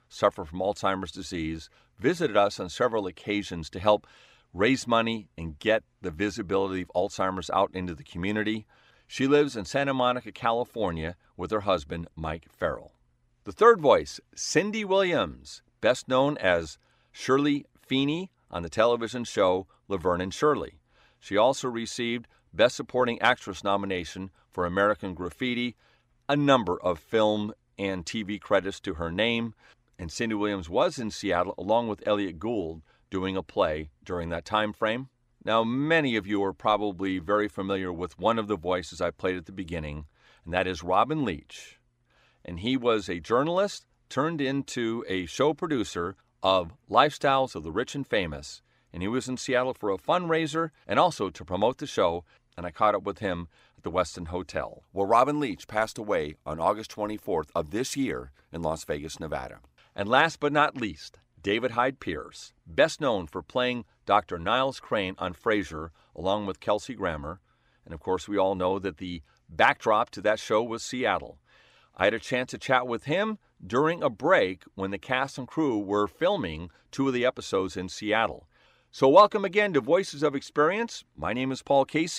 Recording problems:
abrupt cut into speech; at the end

